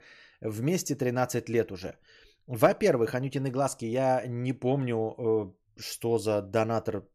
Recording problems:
none

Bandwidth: 14.5 kHz